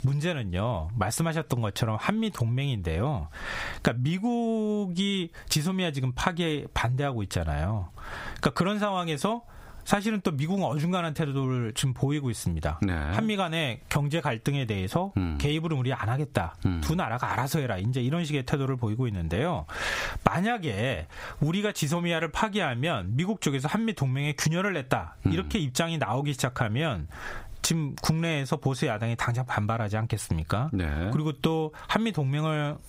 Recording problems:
squashed, flat; somewhat

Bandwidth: 15.5 kHz